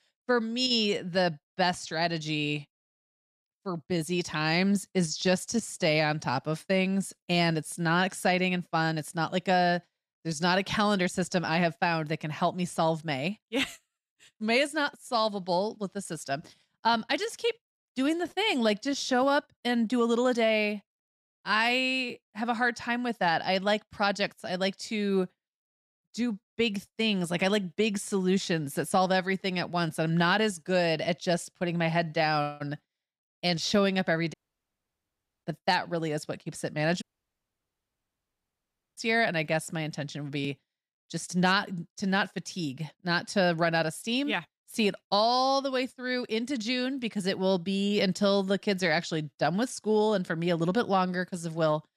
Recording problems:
audio cutting out; at 34 s for 1 s and at 37 s for 2 s

